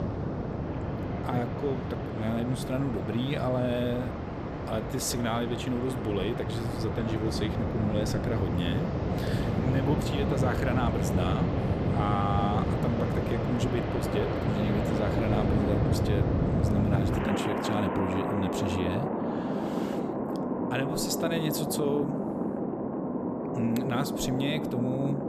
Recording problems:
rain or running water; very loud; throughout; 2 dB above the speech

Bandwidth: 14 kHz